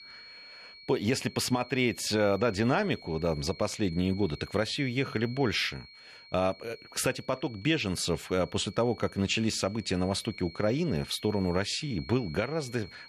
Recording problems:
high-pitched whine; noticeable; throughout; 4.5 kHz, 20 dB below the speech

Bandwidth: 13.5 kHz